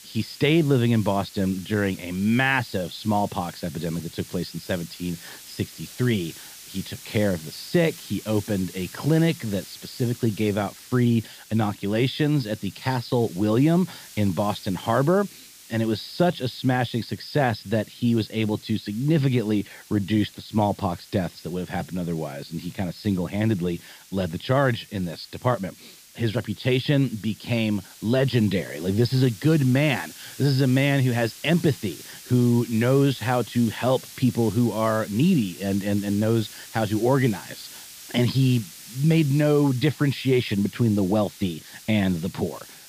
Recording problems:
high frequencies cut off; noticeable; nothing above 5.5 kHz
hiss; noticeable; throughout; 20 dB below the speech

